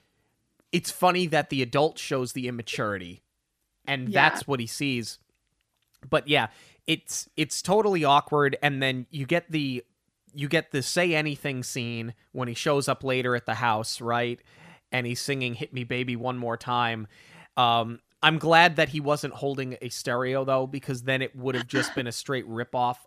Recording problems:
none

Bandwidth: 14.5 kHz